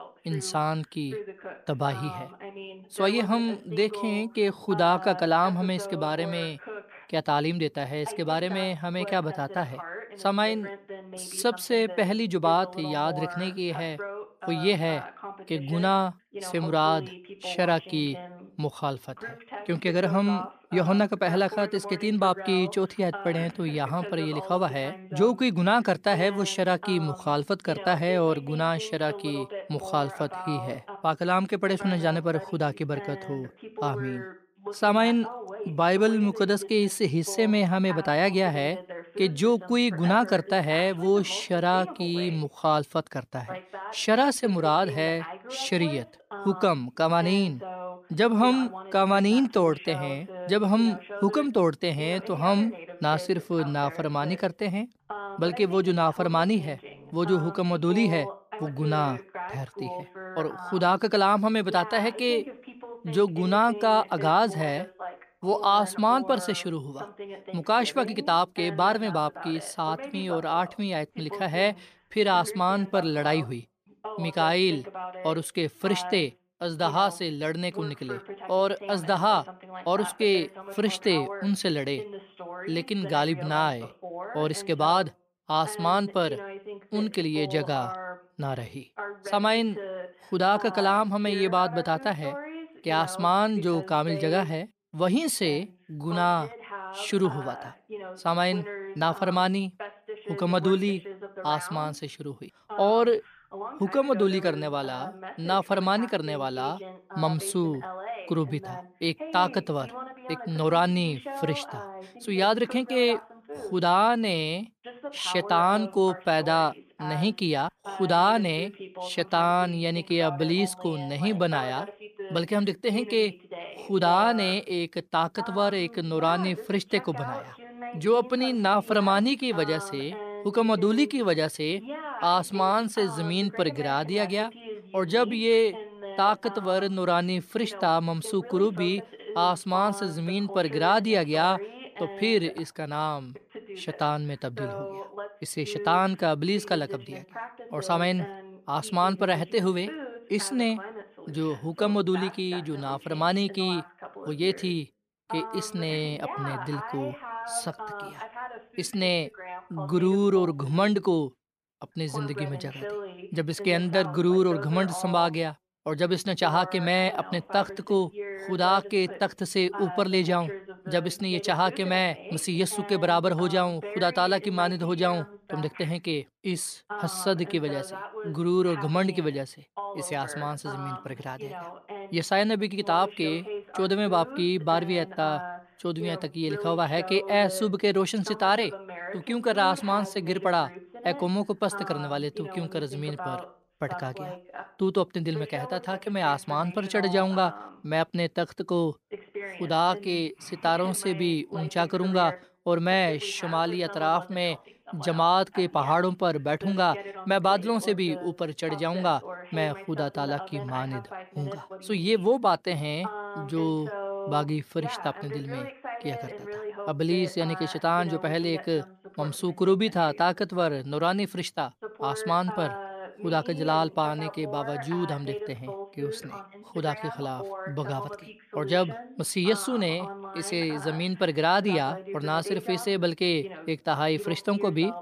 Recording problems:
voice in the background; noticeable; throughout; 15 dB below the speech

